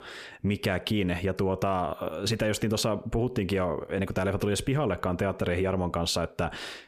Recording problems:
squashed, flat; heavily

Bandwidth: 14.5 kHz